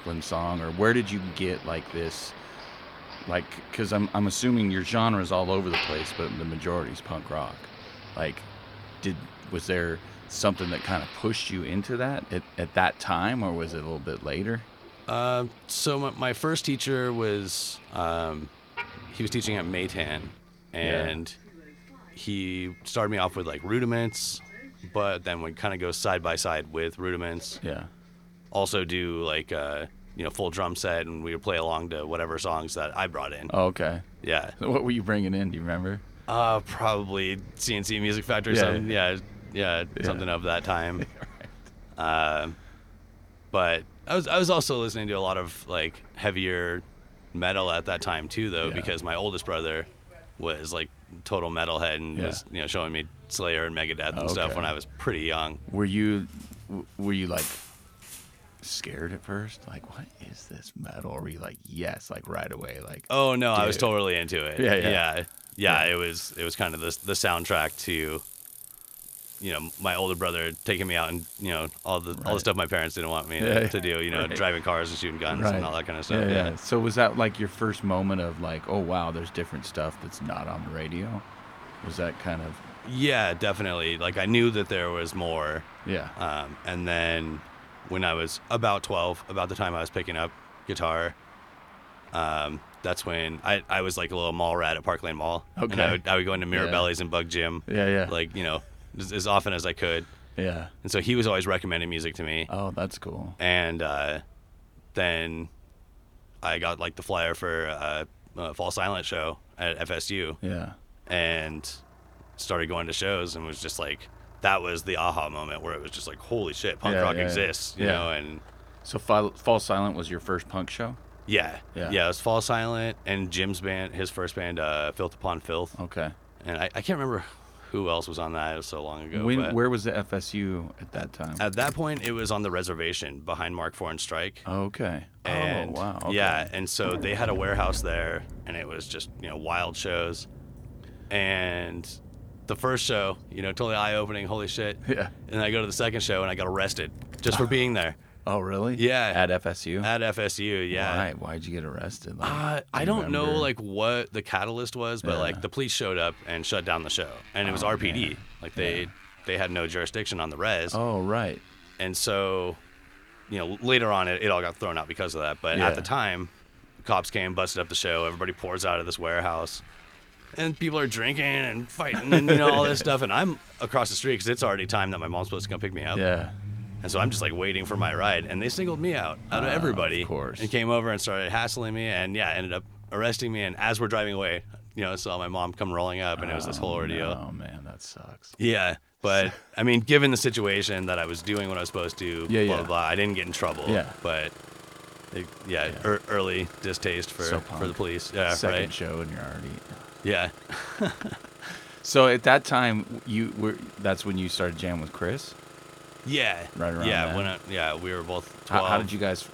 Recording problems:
traffic noise; noticeable; throughout; 15 dB below the speech

